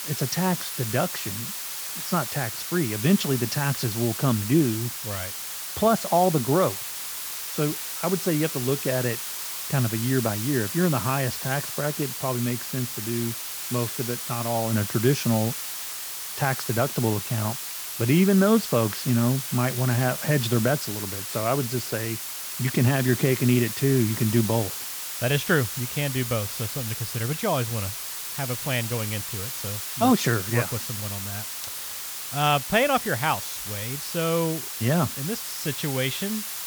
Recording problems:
hiss; loud; throughout; 5 dB below the speech

